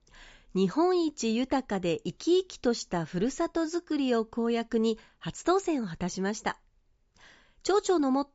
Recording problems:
high frequencies cut off; noticeable; nothing above 7.5 kHz

